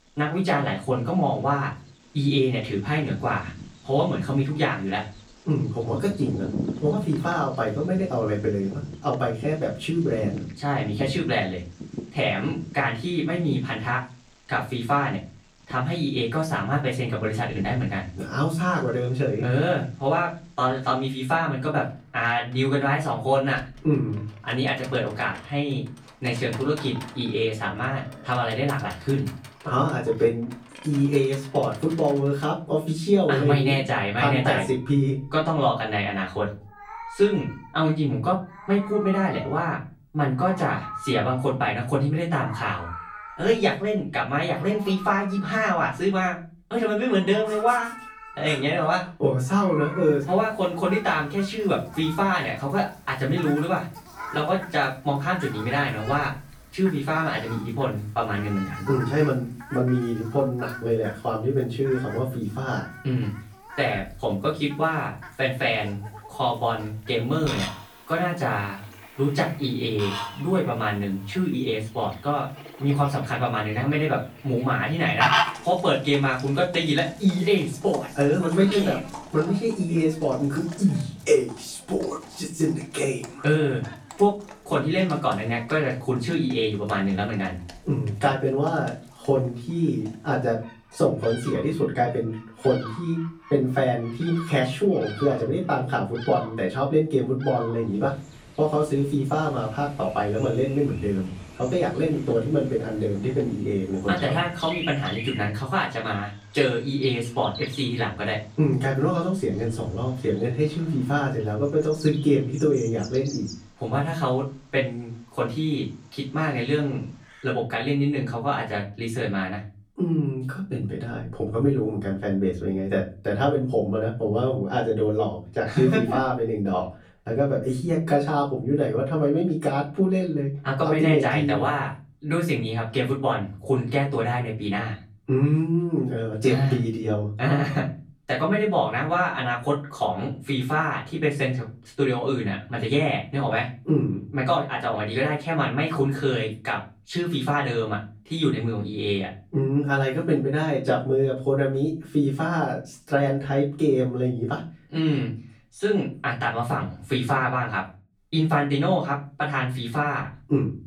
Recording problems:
off-mic speech; far
room echo; slight; dies away in 0.3 s
animal sounds; noticeable; until 1:57; 15 dB below the speech

